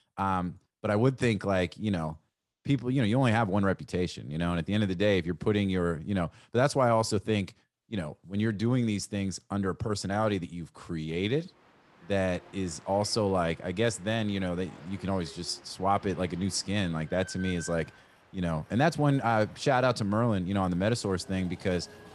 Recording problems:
train or aircraft noise; faint; from 12 s on; 25 dB below the speech

